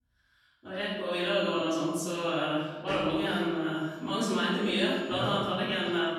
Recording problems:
room echo; strong; dies away in 1 s
off-mic speech; far
high-pitched whine; faint; from 1.5 to 2.5 s and from 3.5 to 5.5 s; 7 kHz, 30 dB below the speech

